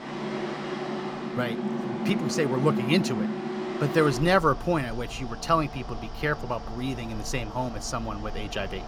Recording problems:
machinery noise; loud; throughout; 5 dB below the speech

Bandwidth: 19 kHz